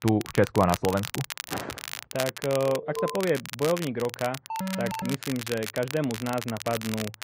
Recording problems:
muffled; very; fading above 1.5 kHz
garbled, watery; slightly
crackle, like an old record; loud; 8 dB below the speech
footsteps; noticeable; at 1.5 s; peak 8 dB below the speech
alarm; noticeable; at 2.5 s and at 4.5 s; peak 4 dB below the speech

